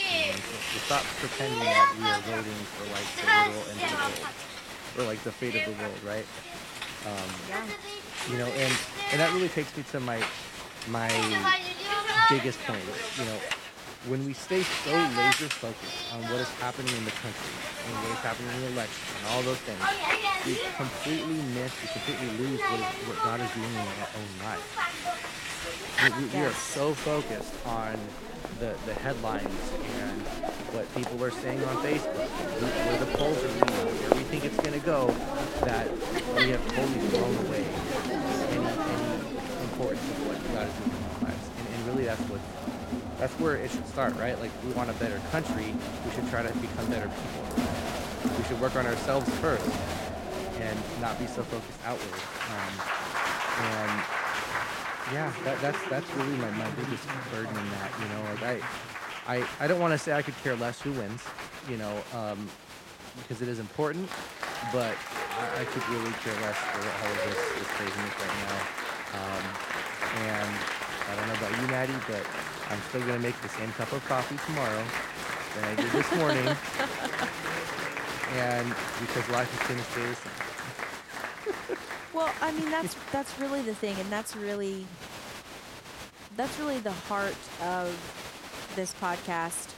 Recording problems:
crowd noise; very loud; throughout; 2 dB above the speech

